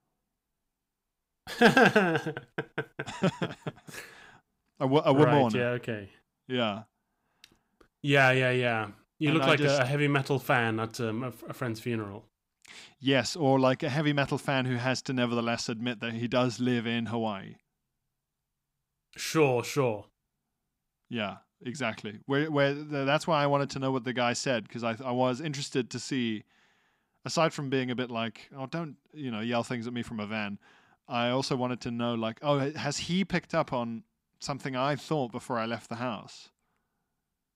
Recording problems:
none

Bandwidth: 15.5 kHz